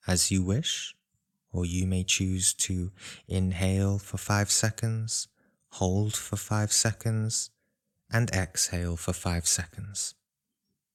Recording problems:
none

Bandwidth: 17 kHz